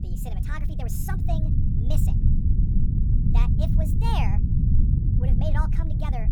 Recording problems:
wrong speed and pitch; too fast and too high; 1.5 times normal speed
low rumble; loud; throughout; 2 dB below the speech

